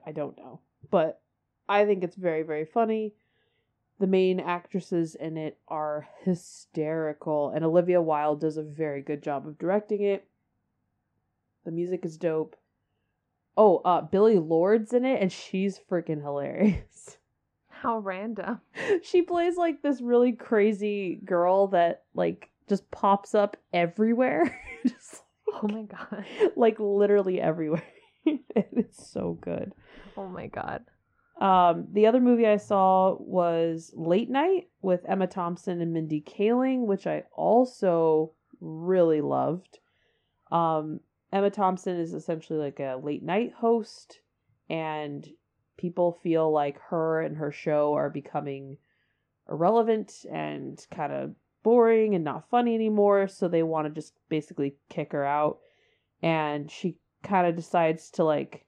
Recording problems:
muffled; very; fading above 3 kHz

